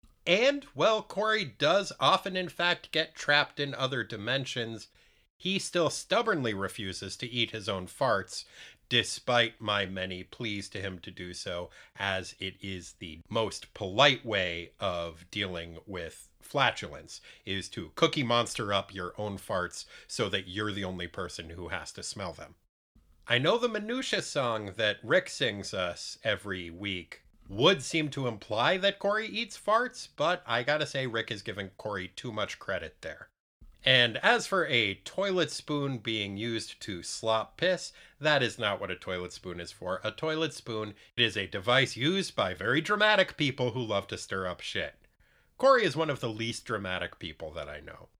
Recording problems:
none

